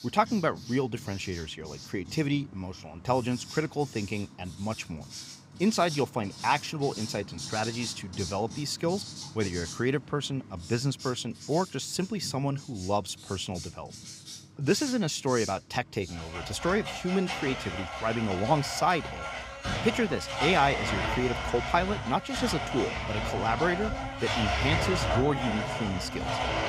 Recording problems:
household noises; loud; throughout; 5 dB below the speech

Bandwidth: 15.5 kHz